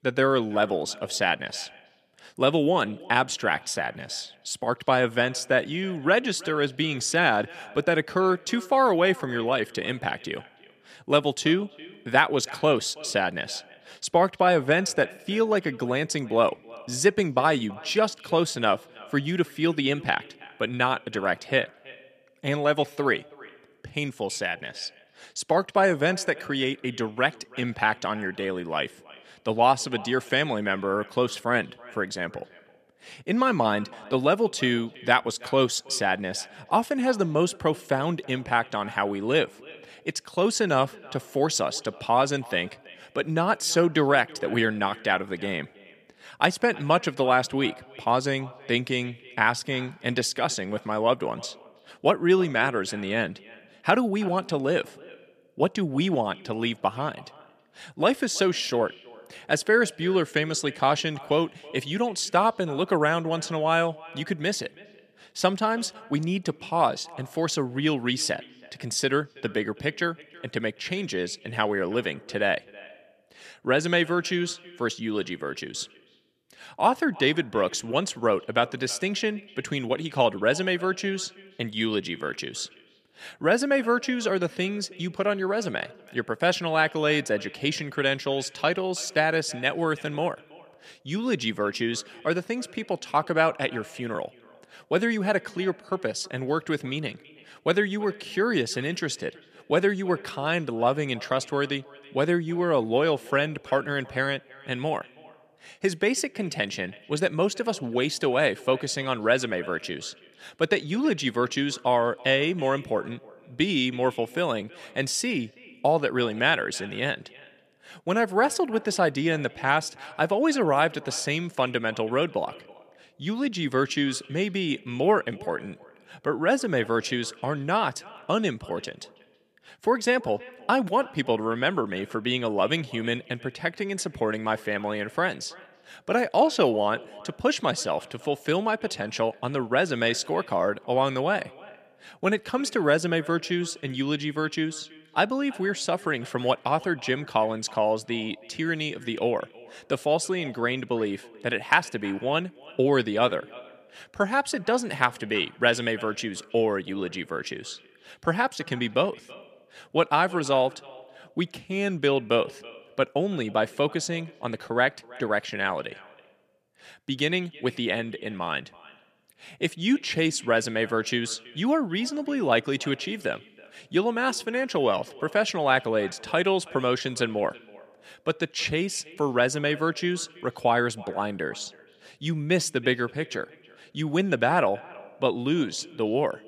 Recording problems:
echo of what is said; faint; throughout; 330 ms later, 20 dB below the speech

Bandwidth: 14.5 kHz